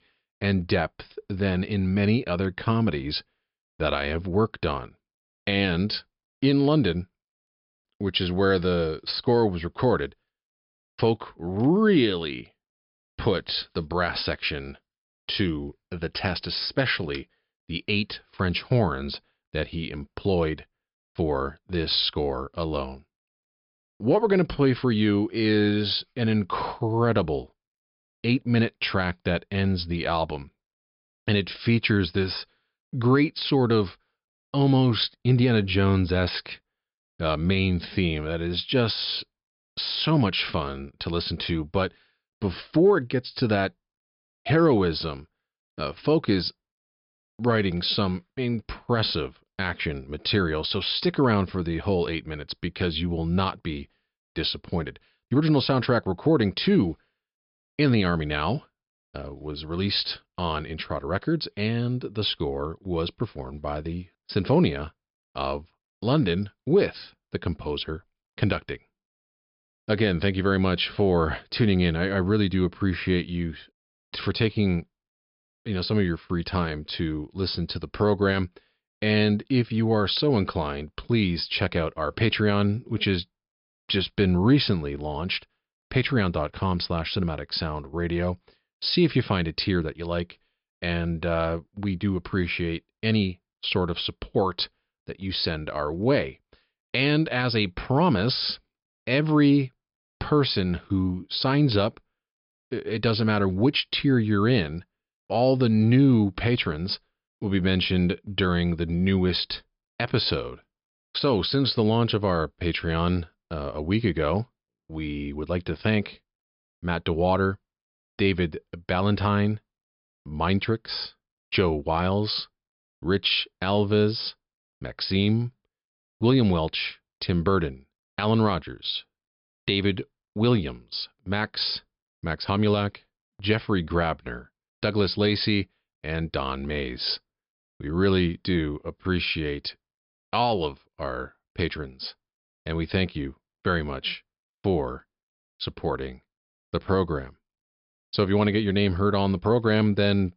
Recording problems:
high frequencies cut off; noticeable; nothing above 5.5 kHz

